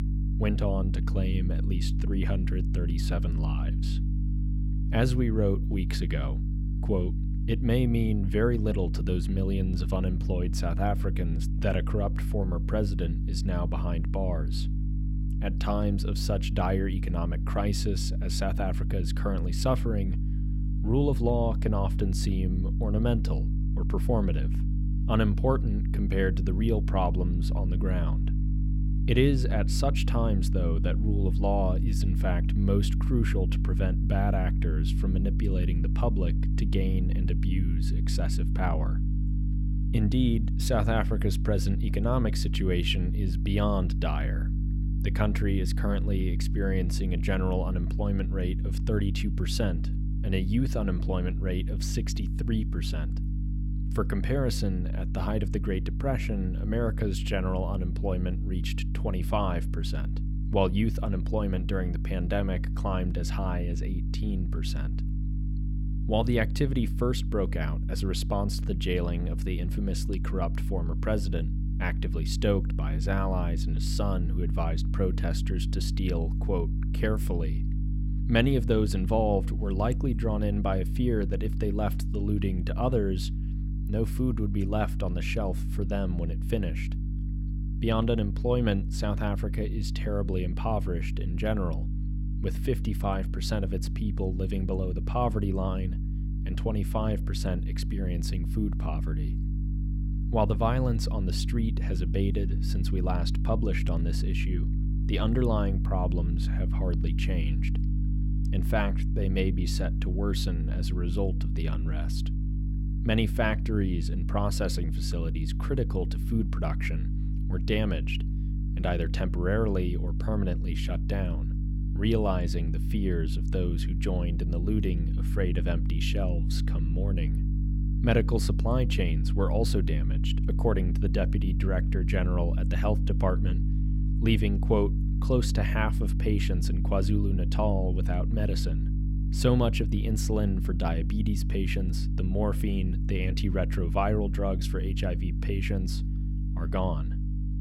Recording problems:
electrical hum; loud; throughout; 50 Hz, 10 dB below the speech

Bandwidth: 16 kHz